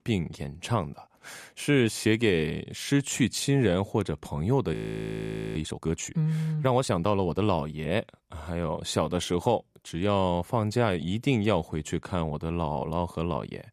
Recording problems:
audio freezing; at 4.5 s for 1 s

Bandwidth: 14.5 kHz